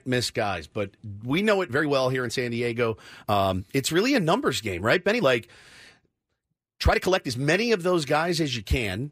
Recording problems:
uneven, jittery; strongly; from 1 to 7.5 s

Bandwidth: 15 kHz